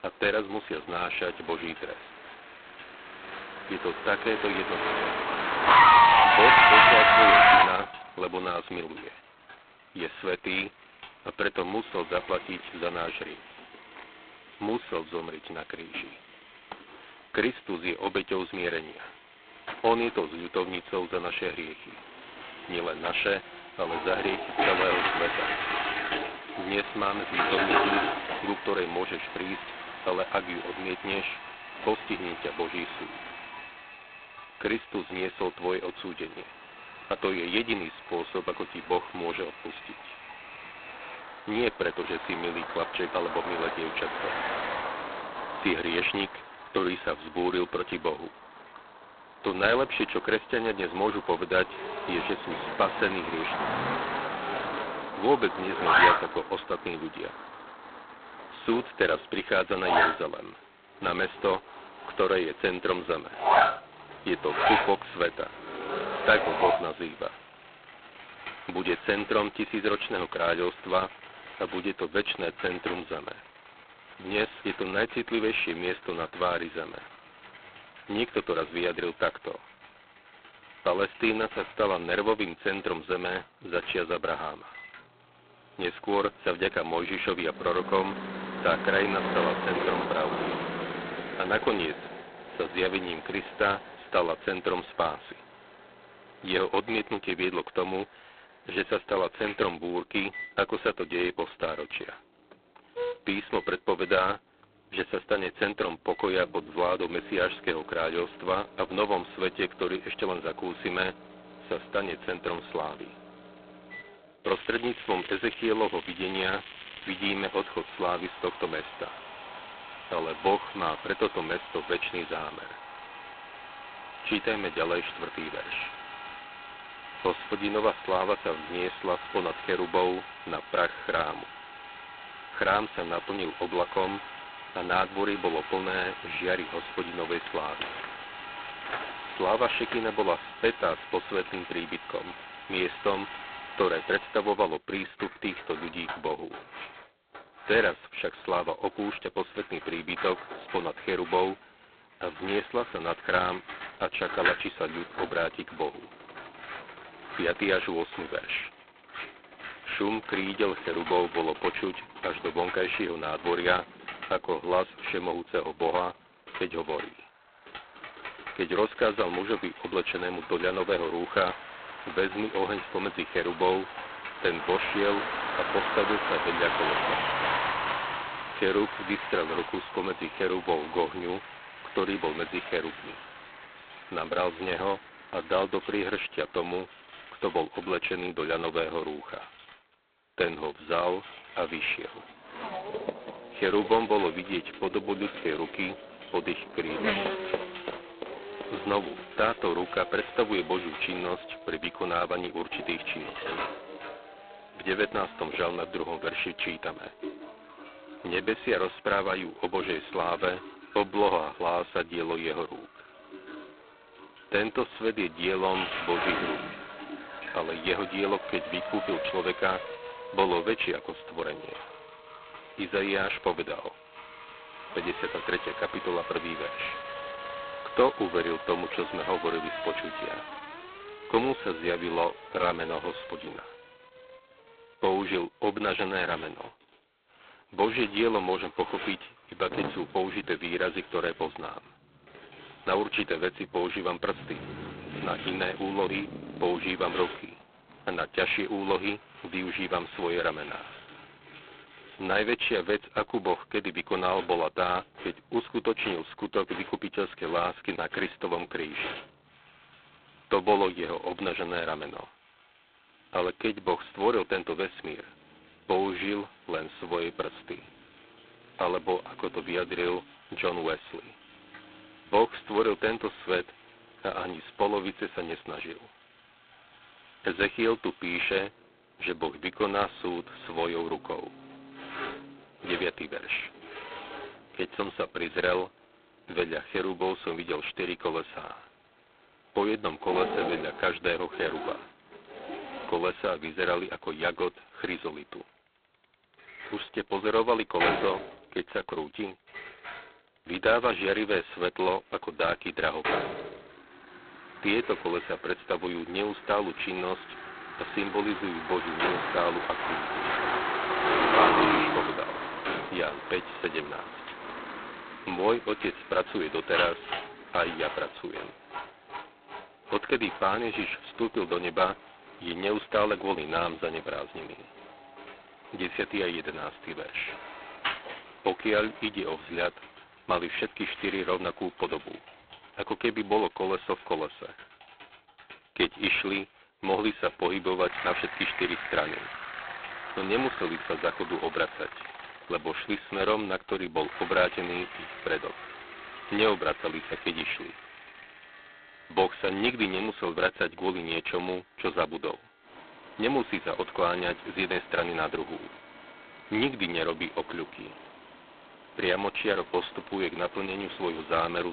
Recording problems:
phone-call audio; poor line; nothing above 4 kHz
traffic noise; very loud; throughout; as loud as the speech
household noises; loud; throughout; 7 dB below the speech
crackling; very faint; from 1:54 to 1:57; 30 dB below the speech
abrupt cut into speech; at the end

